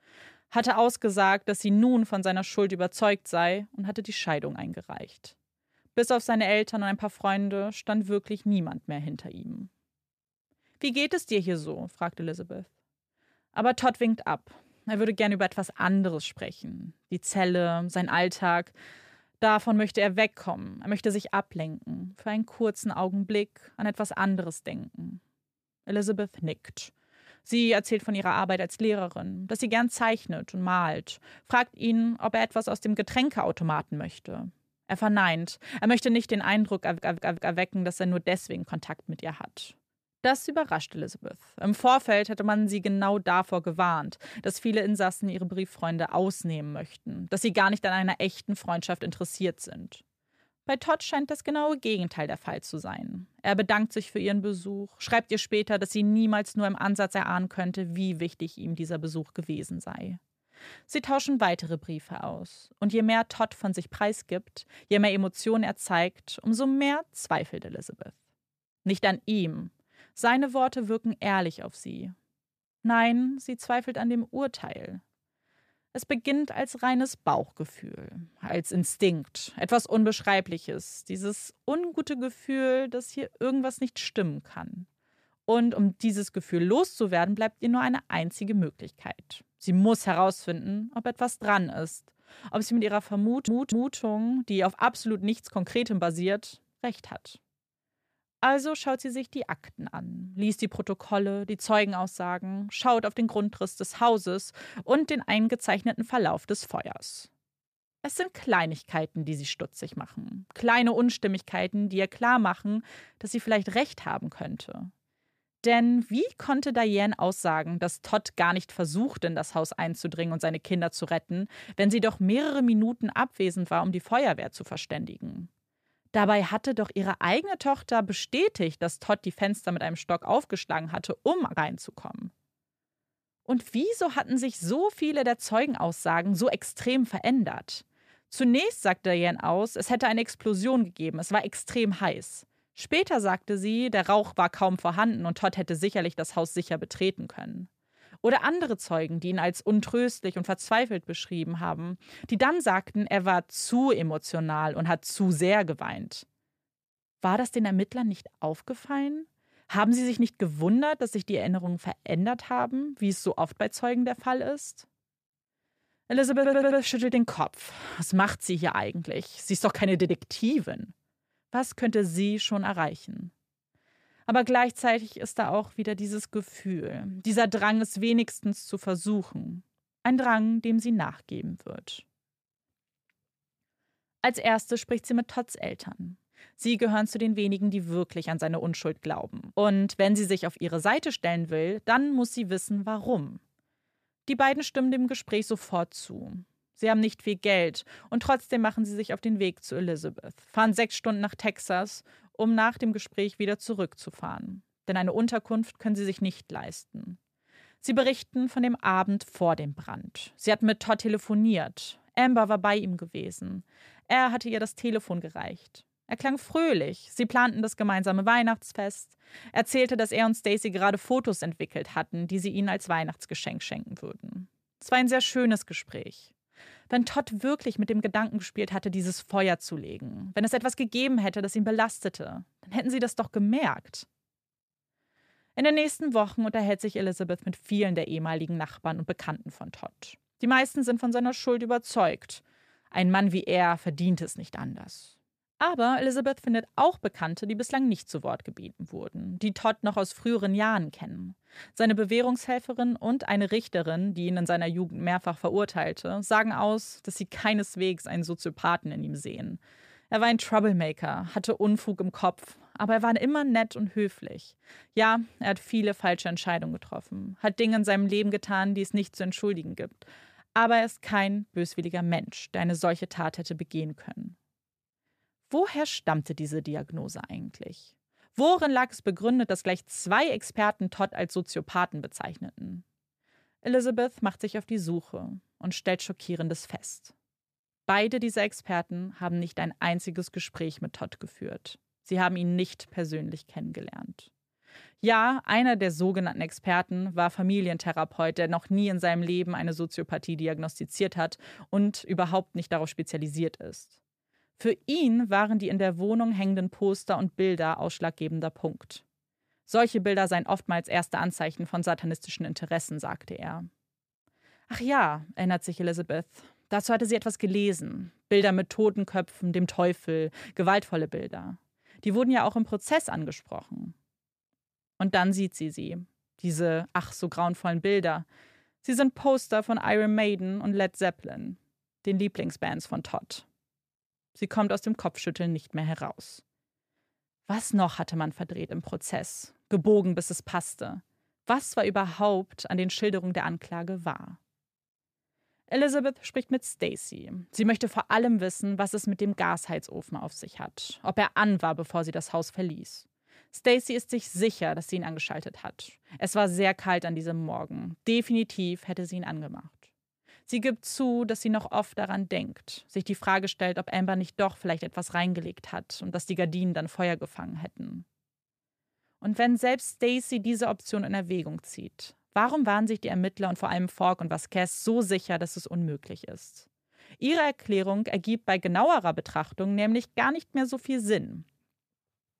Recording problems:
audio stuttering; at 37 s, at 1:33 and at 2:46

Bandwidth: 14.5 kHz